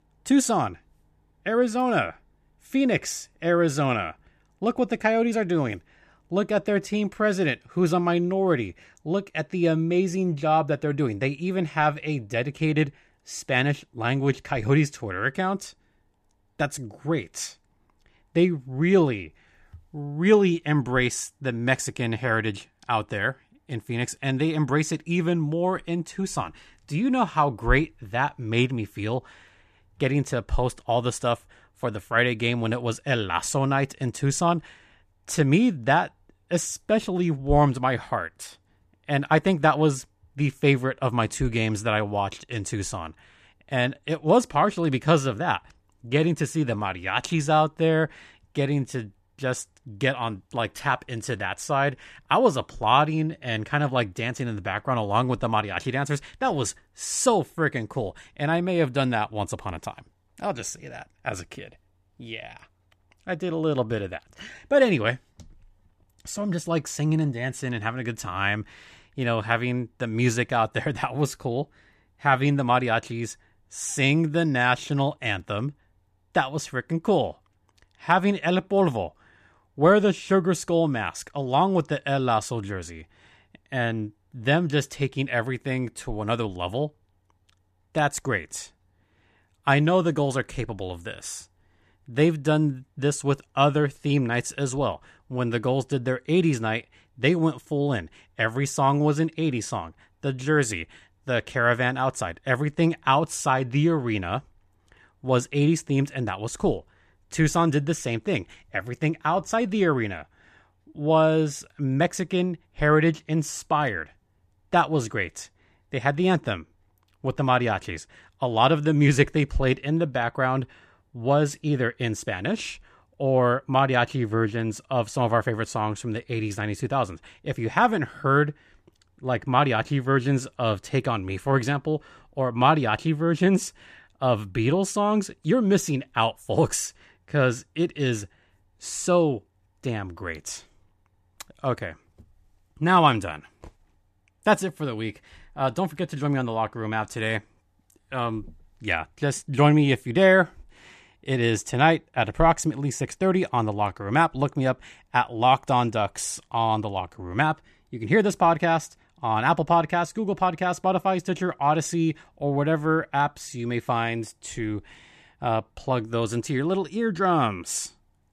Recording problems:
none

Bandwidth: 14.5 kHz